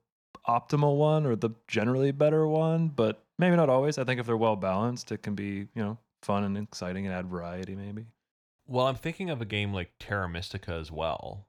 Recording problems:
none

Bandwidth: 18.5 kHz